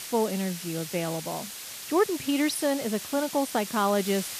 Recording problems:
hiss; loud; throughout; 8 dB below the speech

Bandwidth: 14.5 kHz